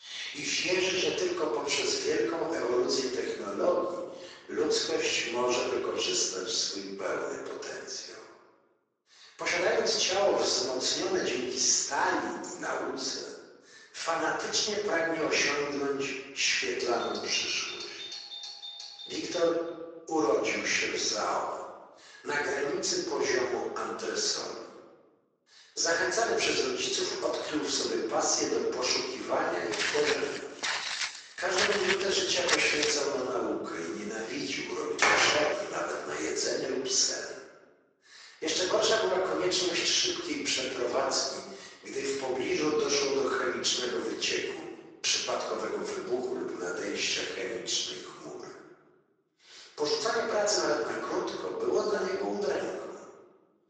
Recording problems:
off-mic speech; far
thin; very; fading below 400 Hz
room echo; noticeable; dies away in 1.3 s
garbled, watery; slightly
doorbell; noticeable; from 17 to 20 s; peak 9 dB below the speech
footsteps; loud; from 30 to 33 s; peak 2 dB above the speech
door banging; loud; at 35 s; peak 5 dB above the speech

